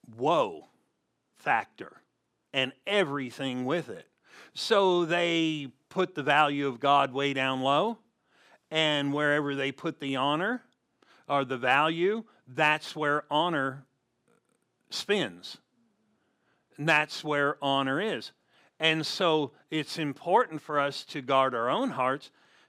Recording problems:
none

